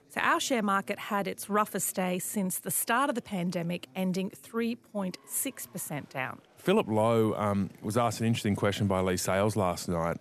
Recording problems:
chatter from many people; faint; throughout; 30 dB below the speech

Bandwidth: 13.5 kHz